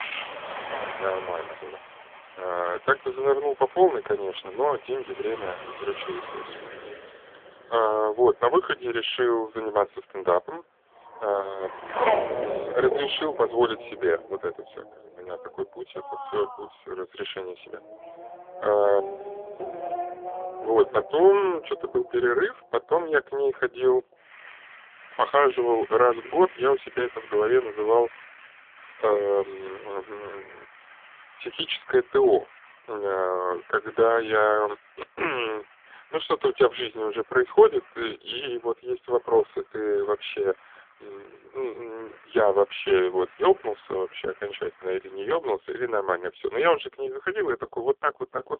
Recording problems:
phone-call audio; poor line; nothing above 3.5 kHz
traffic noise; noticeable; throughout; 10 dB below the speech

